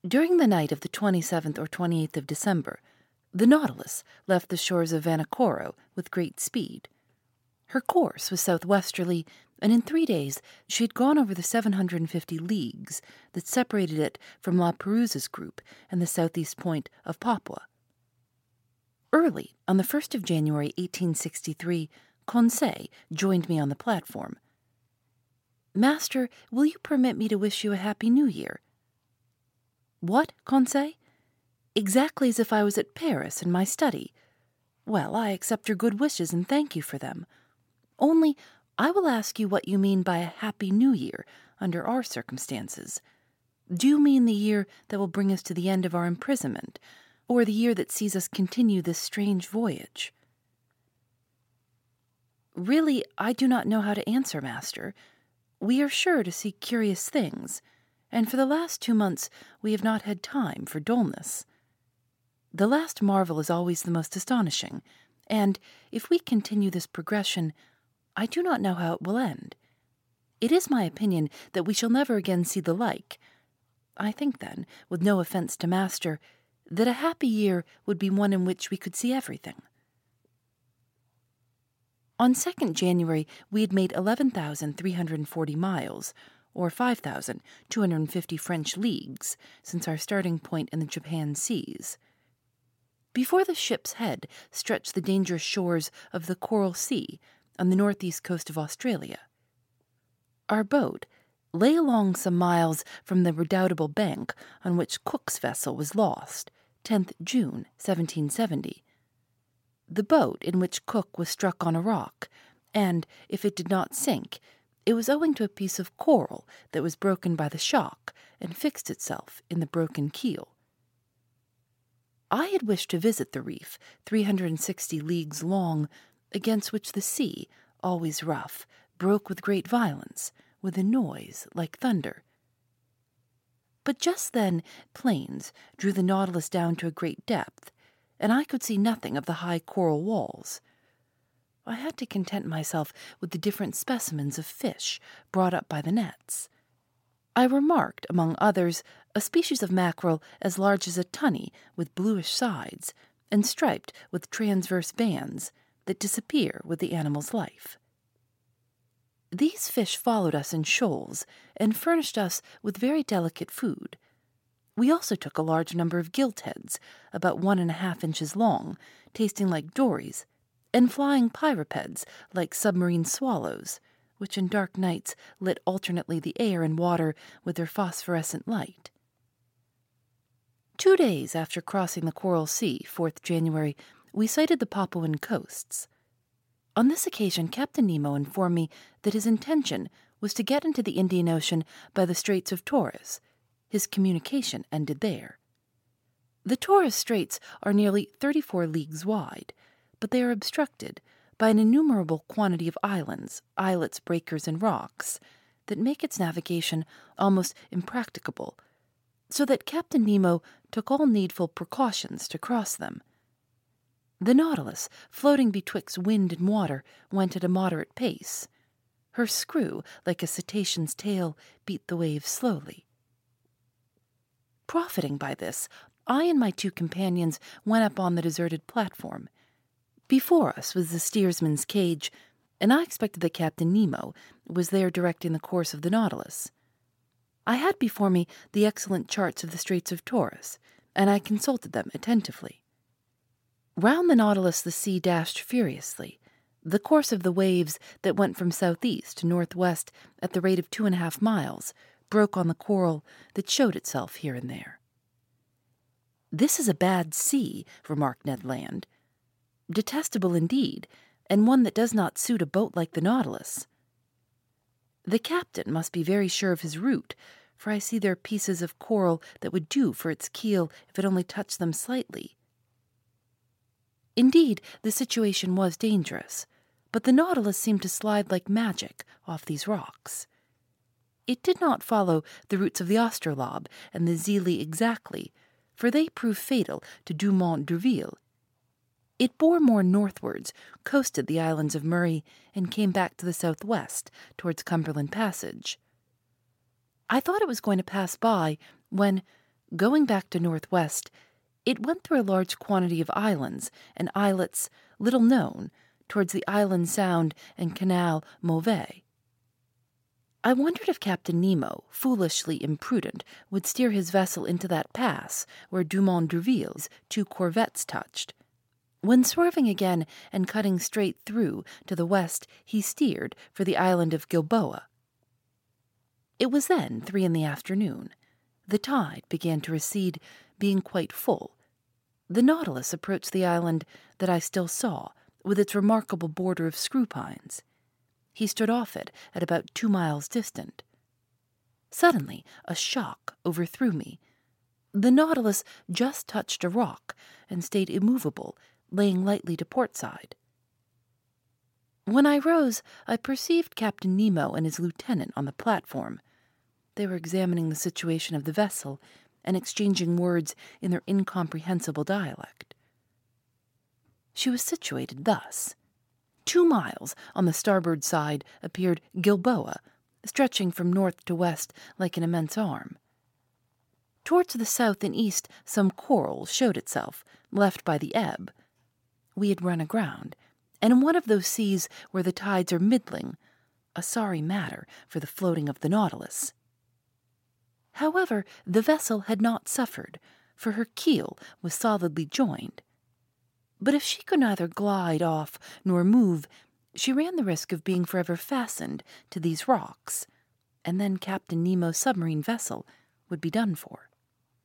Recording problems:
none

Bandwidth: 16.5 kHz